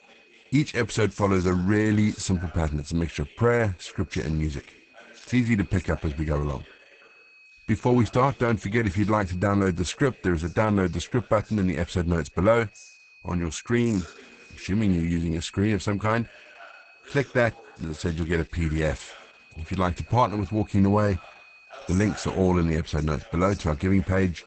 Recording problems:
garbled, watery; badly; nothing above 8 kHz
high-pitched whine; faint; throughout; 2.5 kHz, 25 dB below the speech
voice in the background; faint; throughout; 25 dB below the speech

